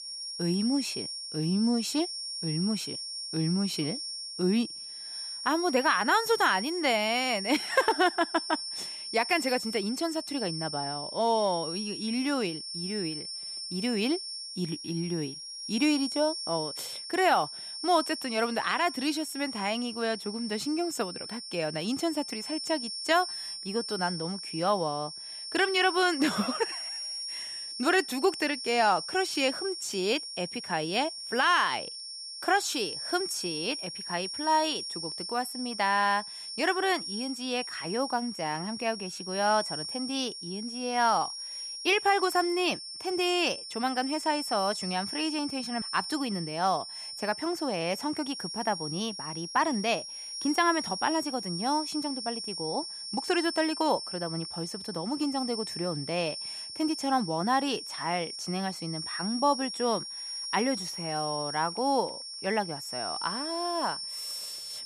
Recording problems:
high-pitched whine; loud; throughout; 5.5 kHz, 6 dB below the speech

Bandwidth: 14.5 kHz